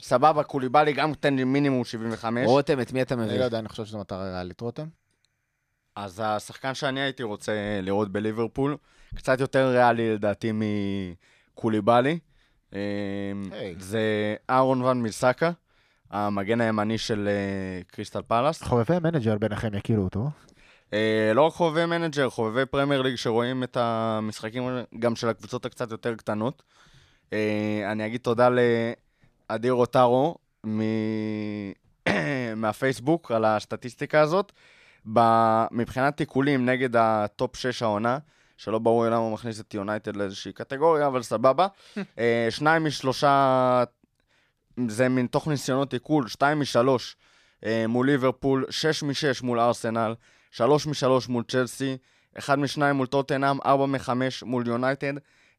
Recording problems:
none

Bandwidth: 14.5 kHz